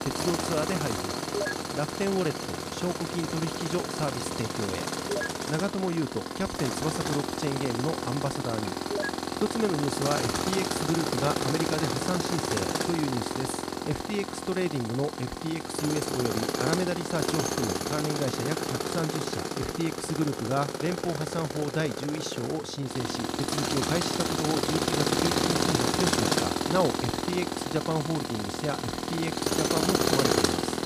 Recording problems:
machinery noise; very loud; throughout; 2 dB above the speech

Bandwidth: 14.5 kHz